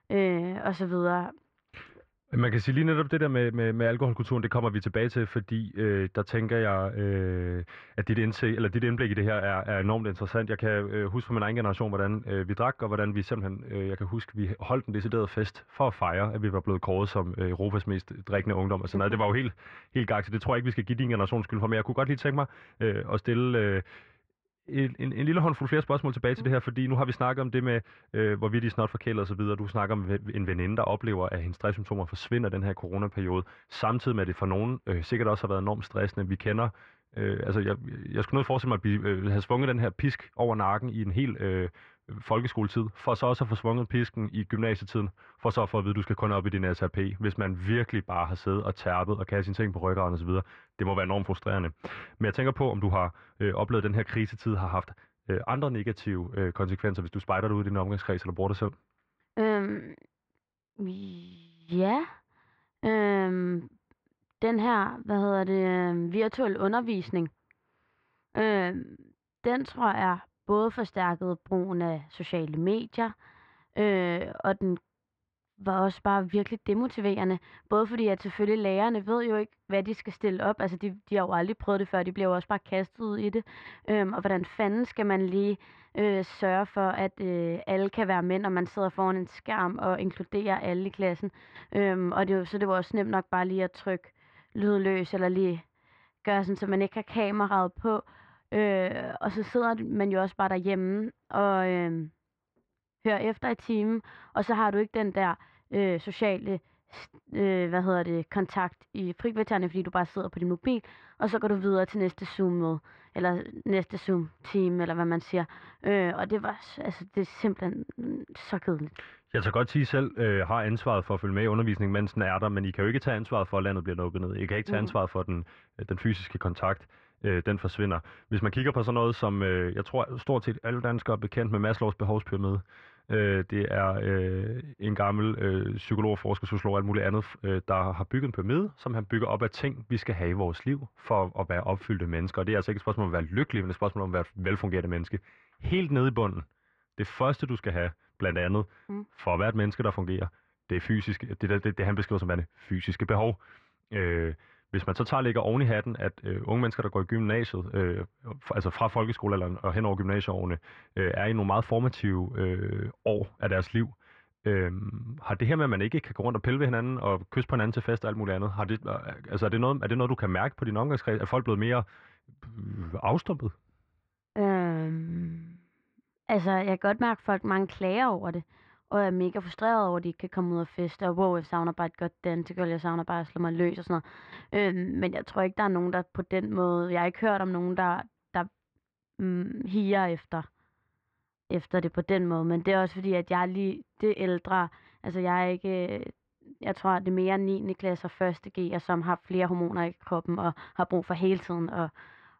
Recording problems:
muffled; very; fading above 1.5 kHz

